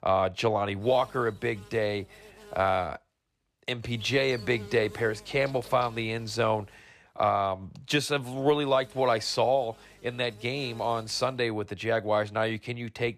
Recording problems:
electrical hum; faint; from 1 to 3 s, from 4 to 7 s and from 8 to 11 s; 50 Hz, 20 dB below the speech

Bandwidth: 14.5 kHz